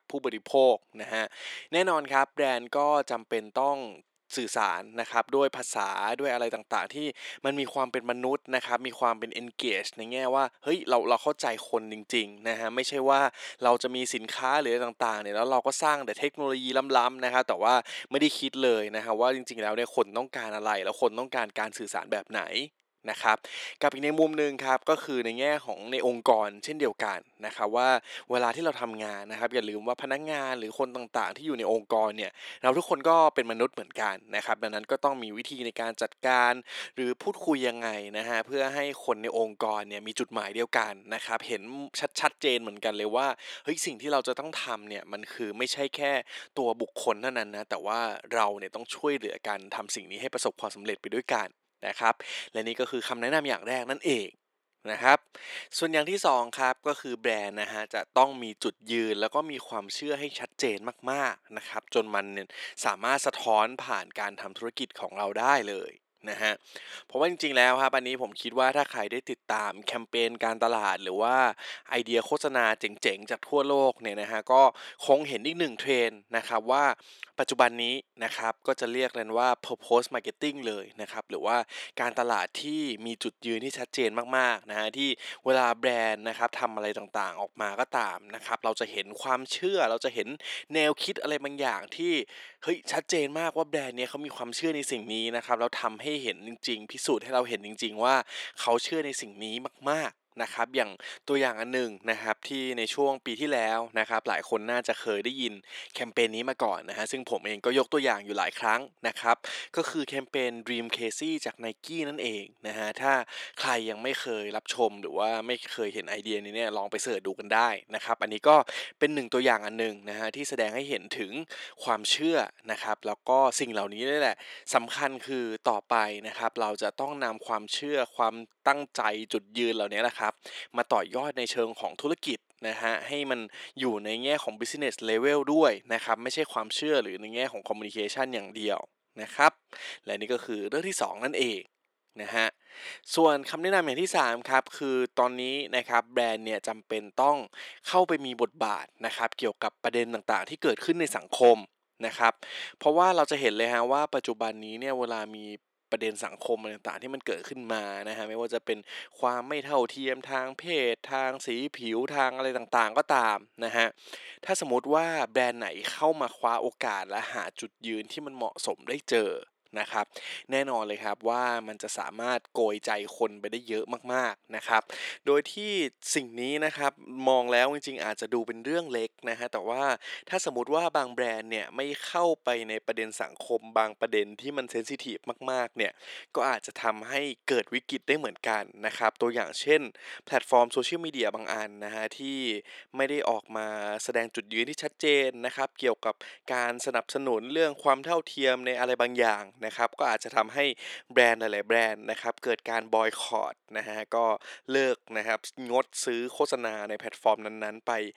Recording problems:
thin; very; fading below 400 Hz

